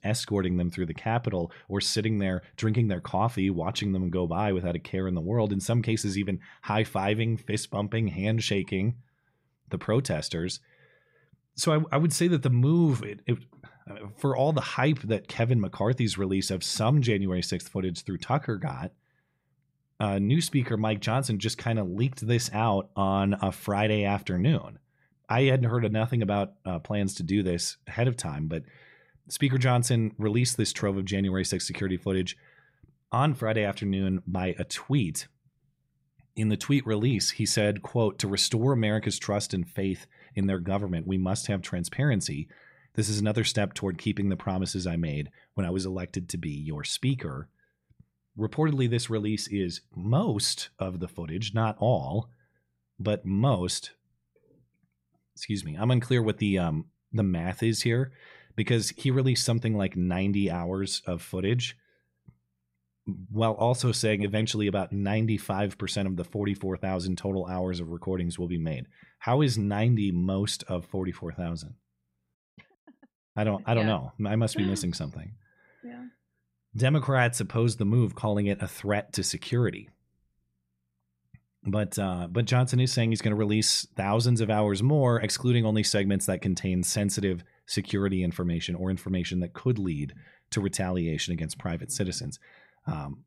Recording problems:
none

